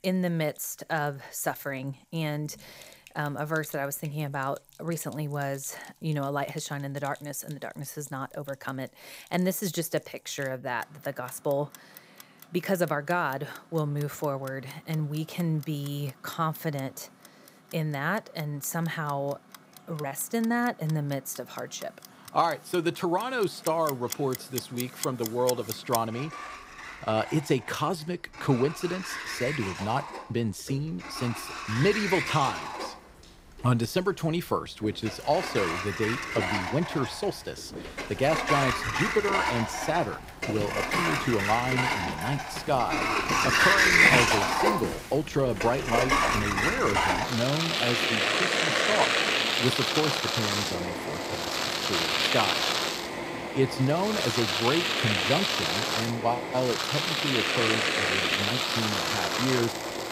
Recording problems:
household noises; very loud; throughout; 4 dB above the speech

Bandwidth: 15.5 kHz